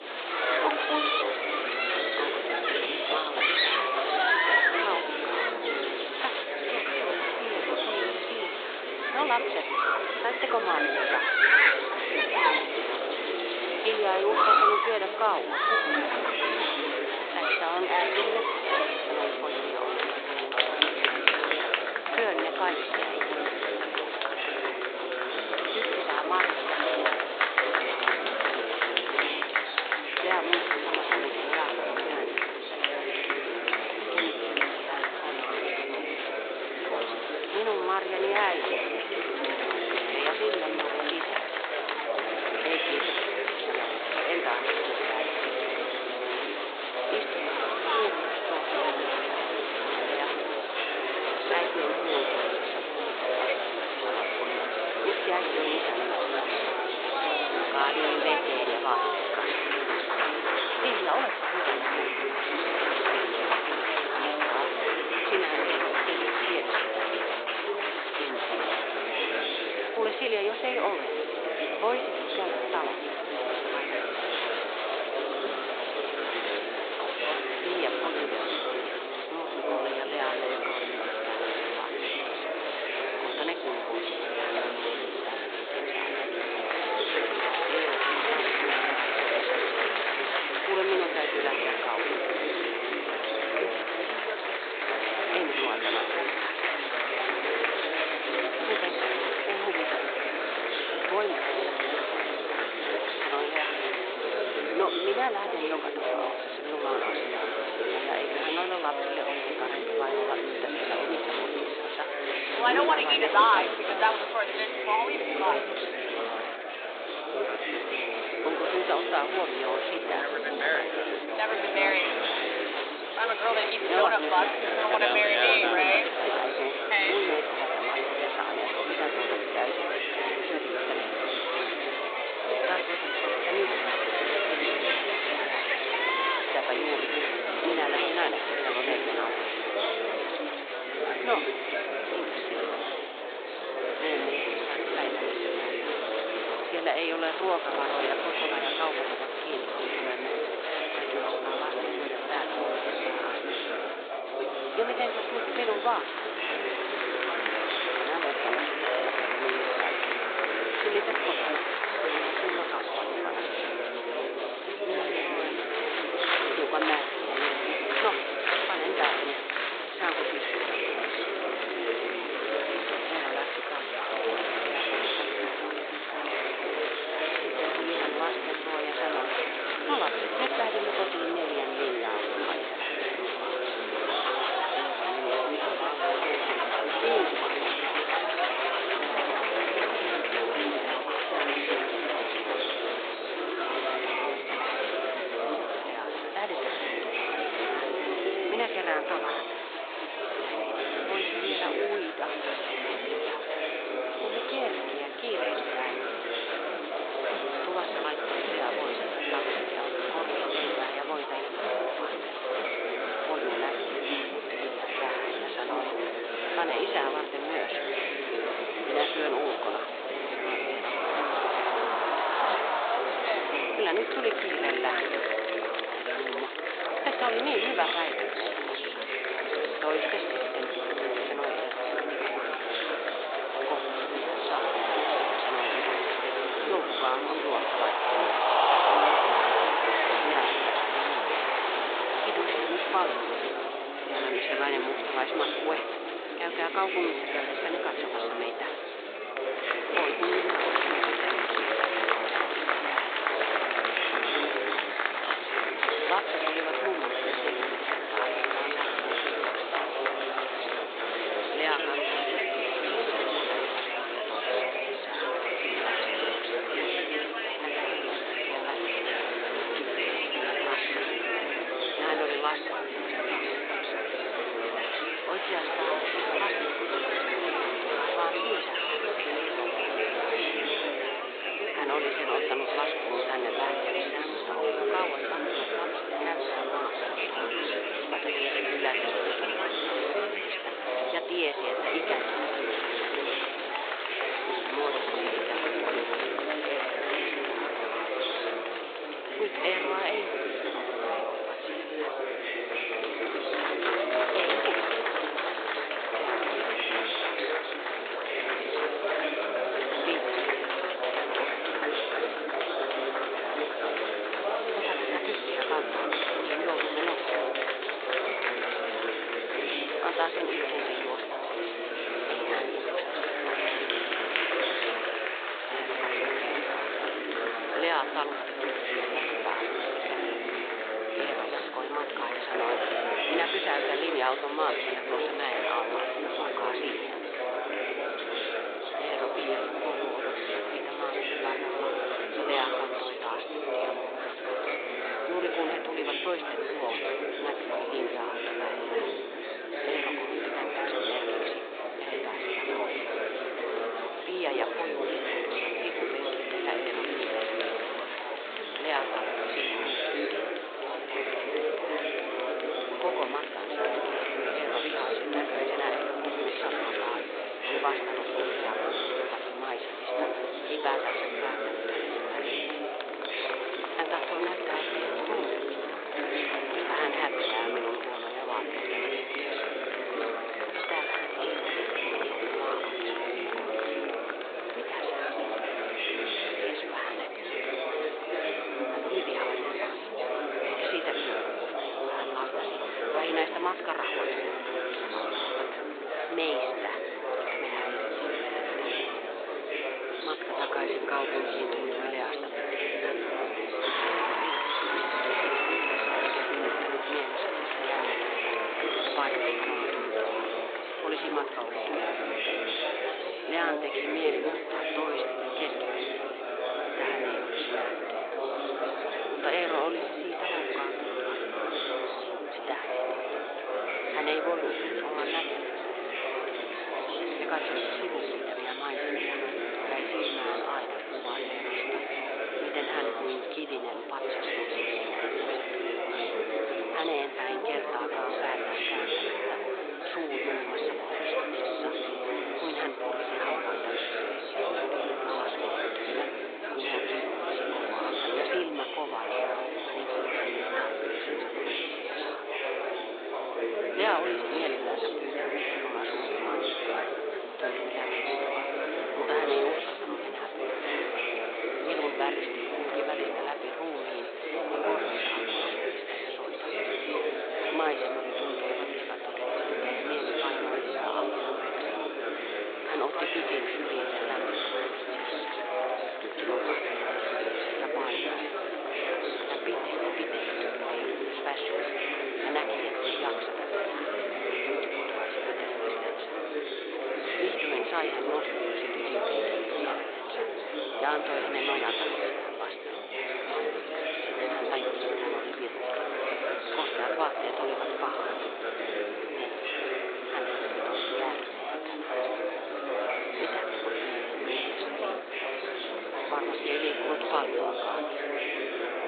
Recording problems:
thin; very; fading below 400 Hz
high frequencies cut off; severe; nothing above 4 kHz
murmuring crowd; very loud; throughout; 6 dB above the speech

